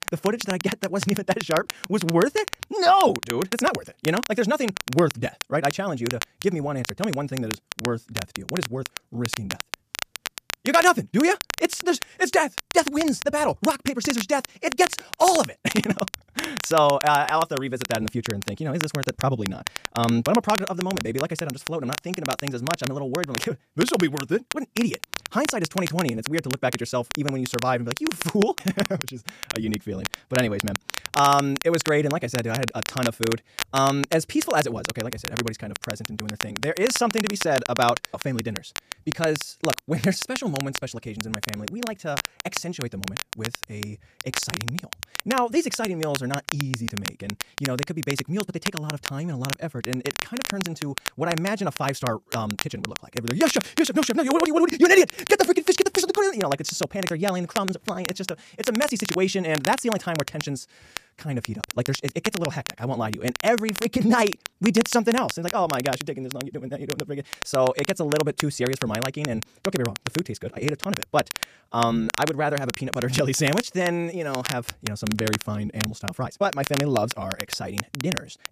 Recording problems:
wrong speed, natural pitch; too fast; 1.6 times normal speed
crackle, like an old record; loud; 7 dB below the speech

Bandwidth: 14.5 kHz